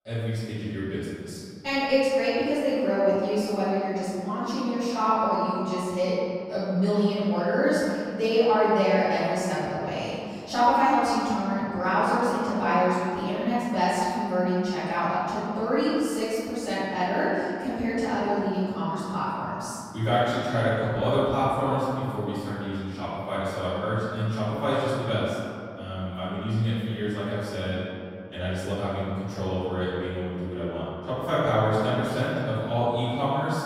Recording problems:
room echo; strong; dies away in 2.5 s
off-mic speech; far

